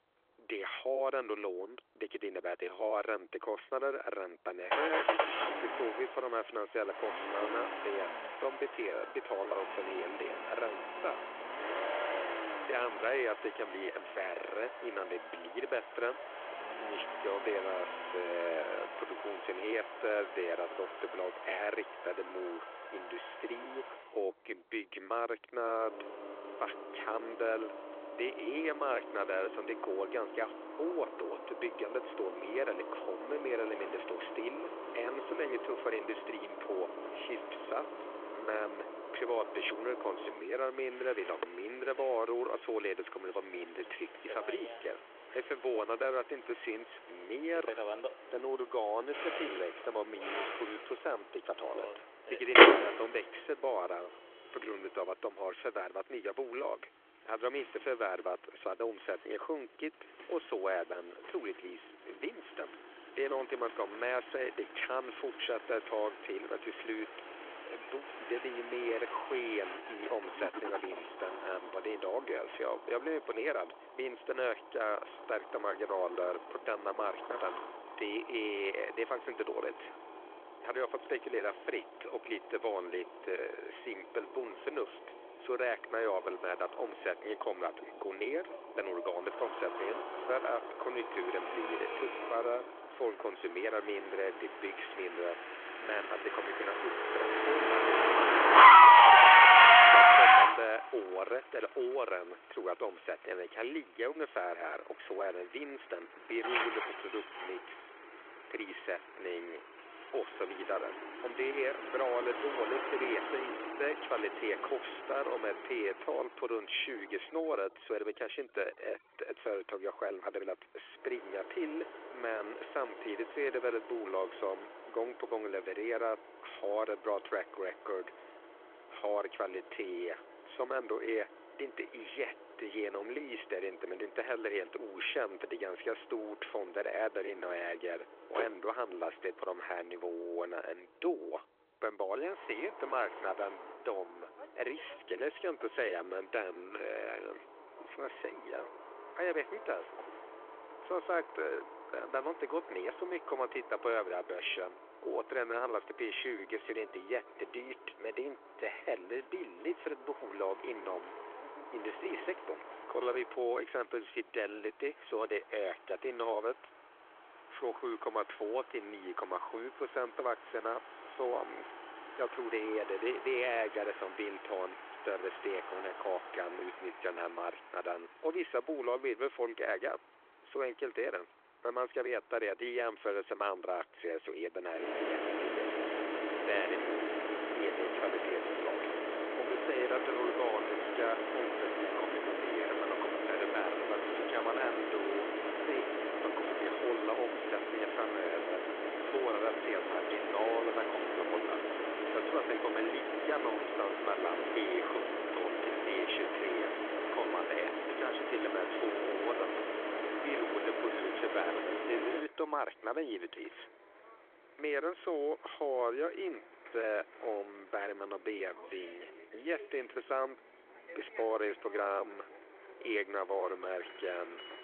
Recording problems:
phone-call audio
traffic noise; very loud; throughout; 9 dB above the speech

